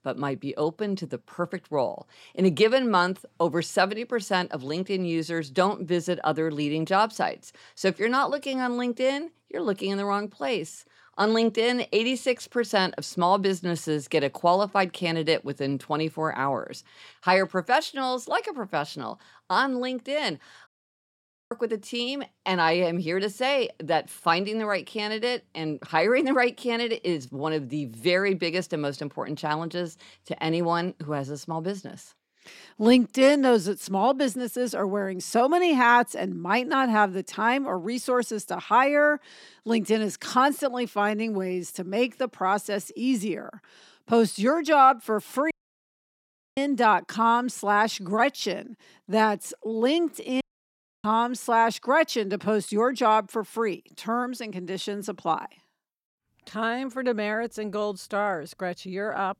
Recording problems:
audio cutting out; at 21 s for 1 s, at 46 s for 1 s and at 50 s for 0.5 s

